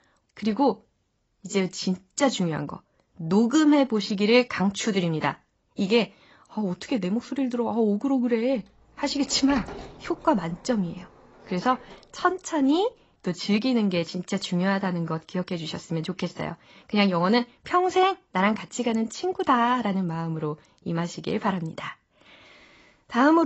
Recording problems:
garbled, watery; badly; nothing above 7.5 kHz
door banging; faint; from 9 to 12 s; peak 10 dB below the speech
abrupt cut into speech; at the end

